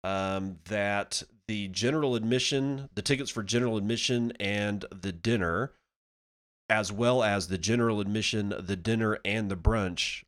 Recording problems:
none

